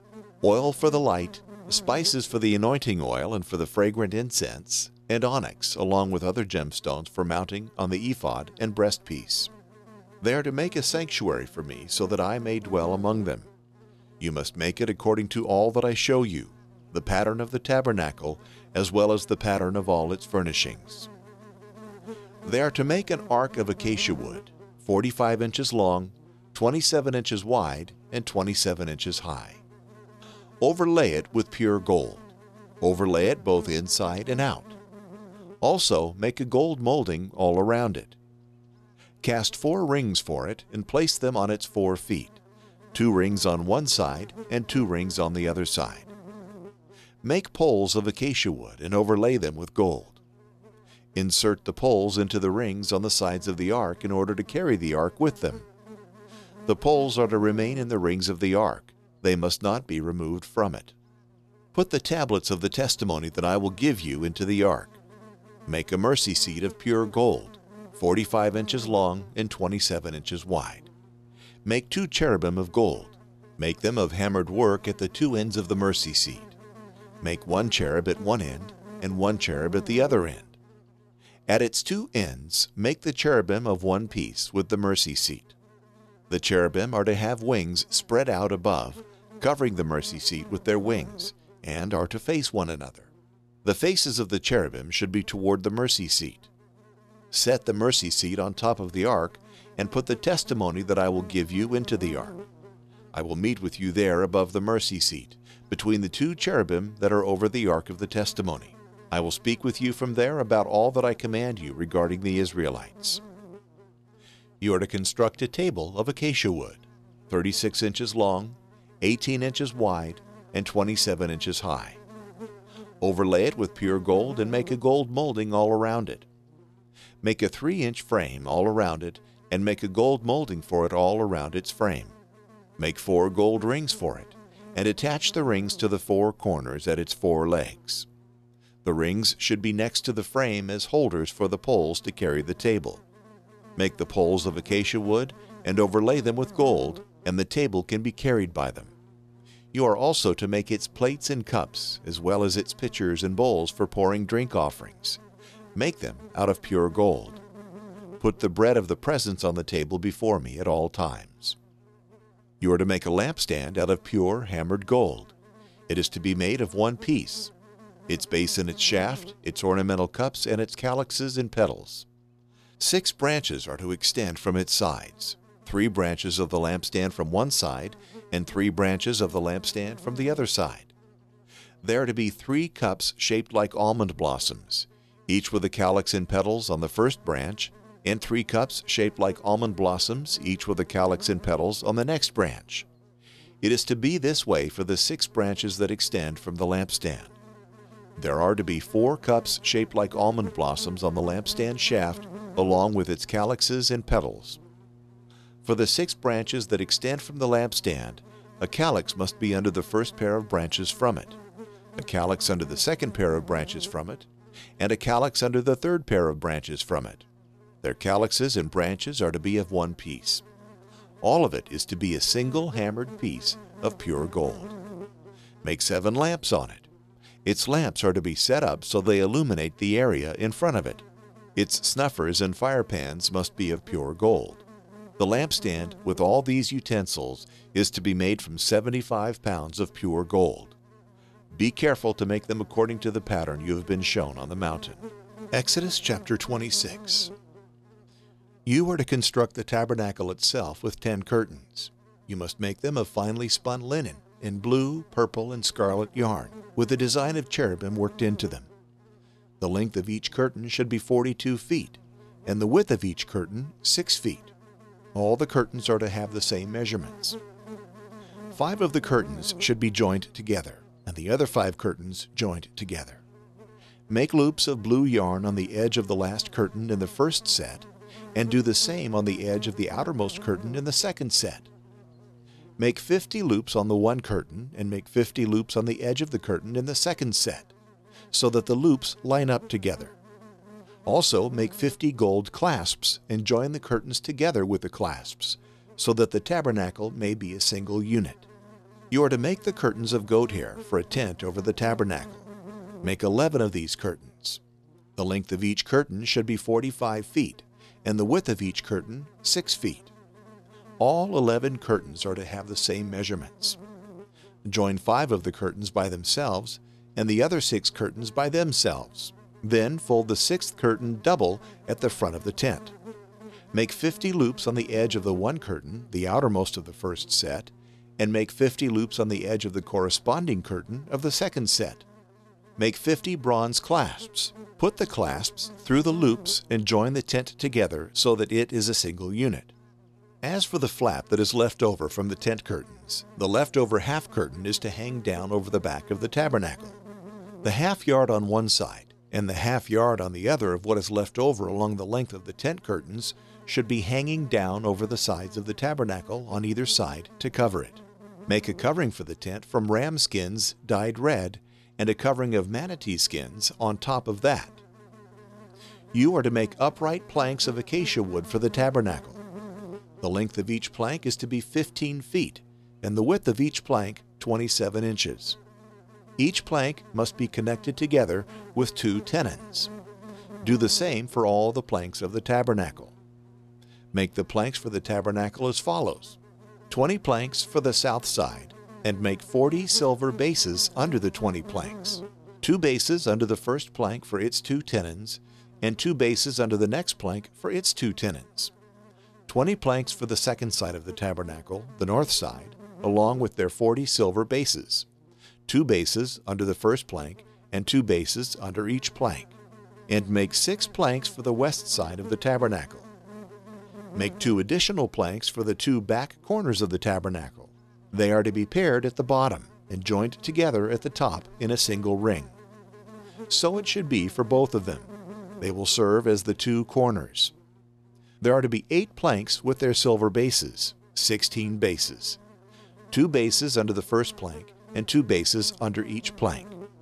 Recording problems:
electrical hum; faint; throughout; 60 Hz, 25 dB below the speech

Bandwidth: 13.5 kHz